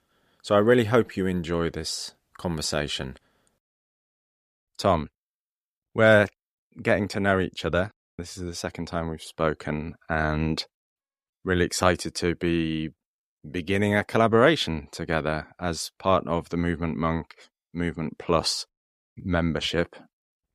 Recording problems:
none

